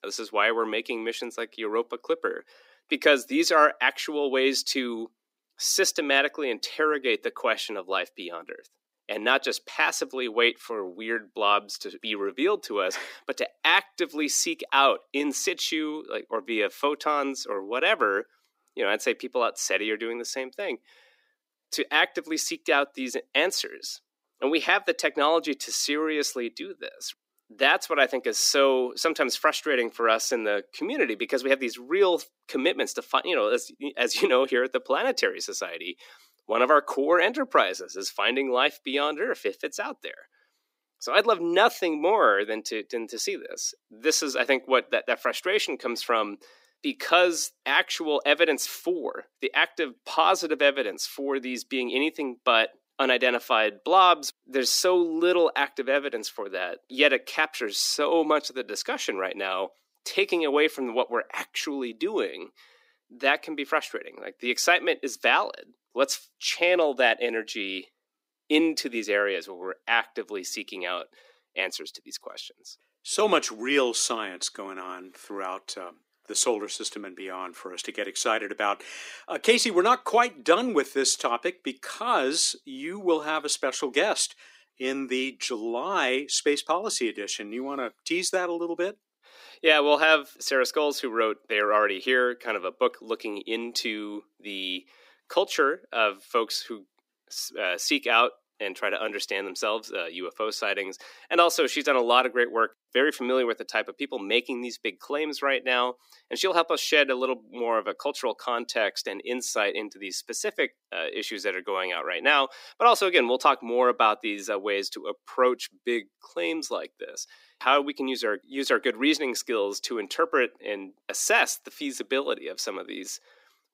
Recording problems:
thin; very slightly; fading below 250 Hz

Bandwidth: 15.5 kHz